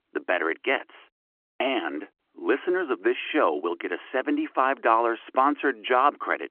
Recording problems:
phone-call audio

